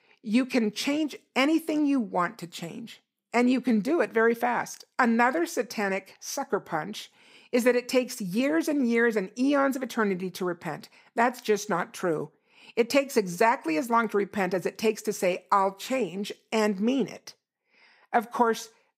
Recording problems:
none

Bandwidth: 15.5 kHz